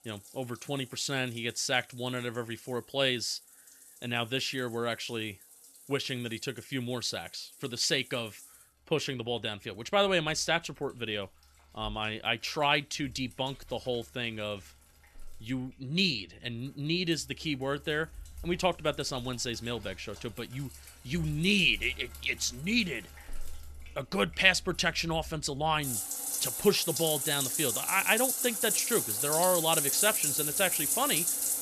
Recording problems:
household noises; very loud; throughout; 2 dB above the speech

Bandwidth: 13.5 kHz